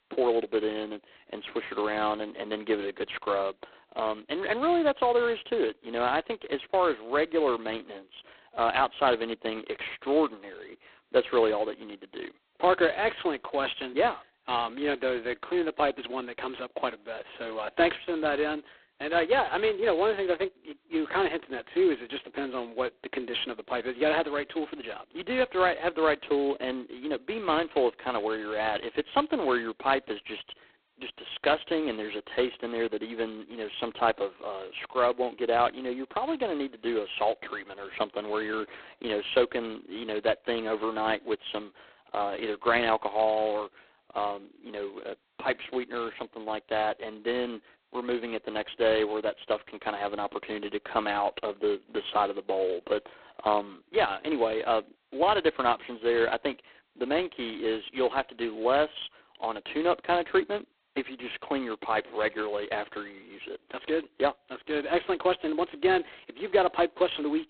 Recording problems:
phone-call audio; poor line; nothing above 4 kHz

